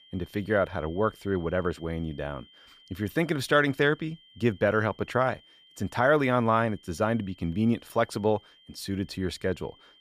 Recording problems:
high-pitched whine; faint; throughout; 3 kHz, 25 dB below the speech

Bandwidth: 15 kHz